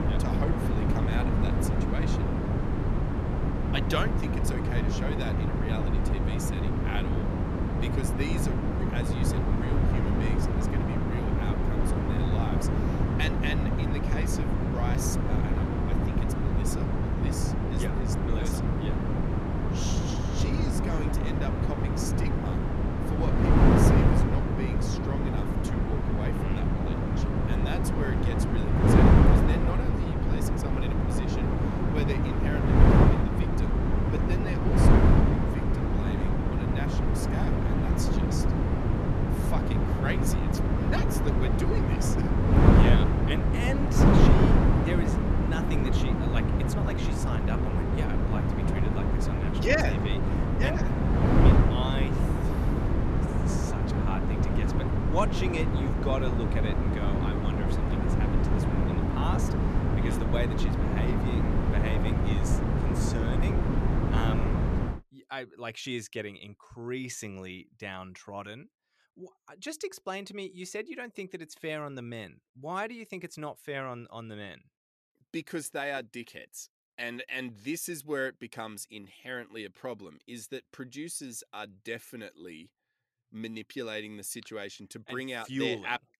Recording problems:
wind noise on the microphone; heavy; until 1:05; 5 dB above the speech

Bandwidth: 13.5 kHz